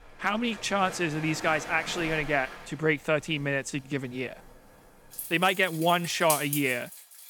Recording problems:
rain or running water; loud; throughout; 9 dB below the speech

